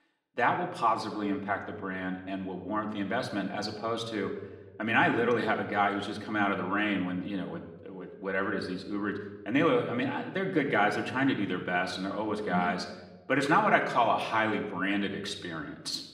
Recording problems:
room echo; slight; dies away in 0.8 s
off-mic speech; somewhat distant

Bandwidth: 14.5 kHz